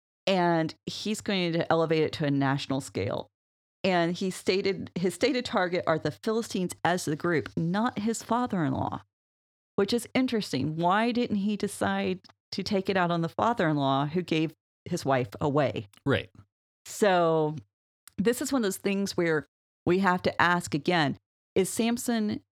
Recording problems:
none

